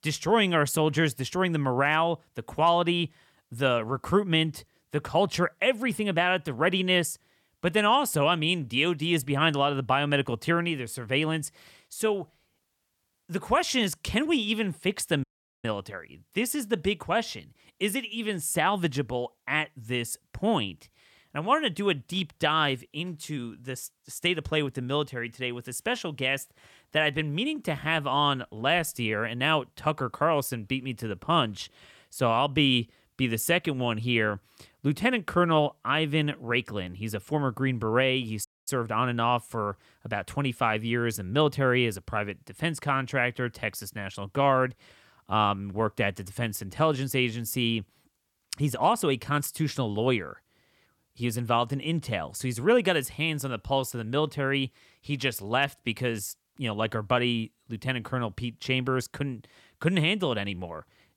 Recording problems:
audio cutting out; at 15 s and at 38 s

